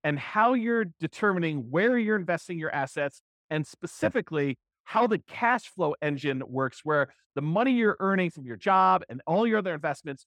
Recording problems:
muffled; slightly; fading above 3.5 kHz

